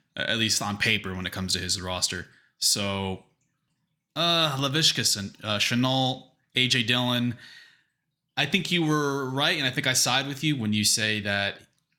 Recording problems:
none

